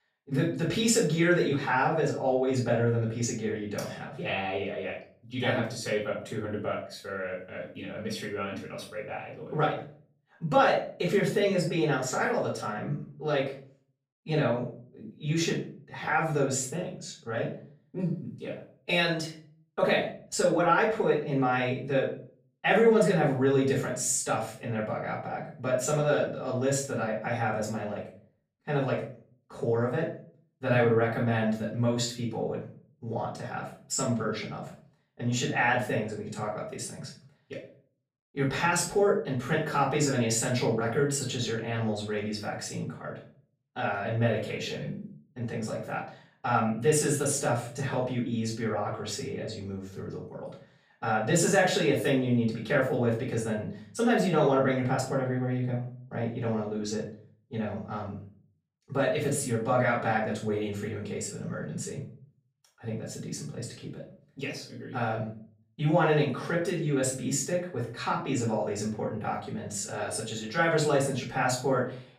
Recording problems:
off-mic speech; far
room echo; slight; dies away in 0.4 s

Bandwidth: 15 kHz